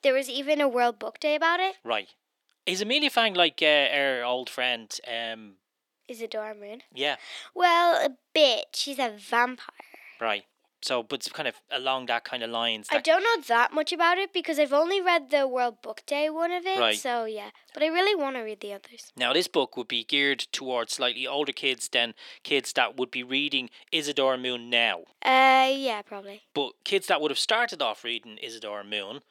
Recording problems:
thin; somewhat; fading below 300 Hz

